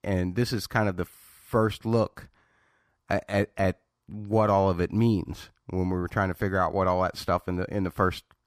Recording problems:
none

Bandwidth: 15 kHz